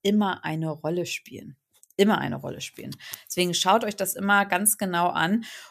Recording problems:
none

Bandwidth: 14.5 kHz